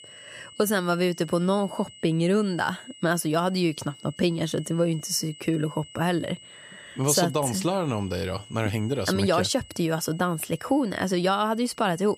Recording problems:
high-pitched whine; faint; throughout; 3 kHz, 20 dB below the speech

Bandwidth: 14.5 kHz